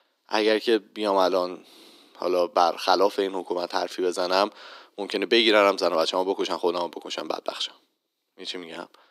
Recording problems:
thin; very; fading below 300 Hz

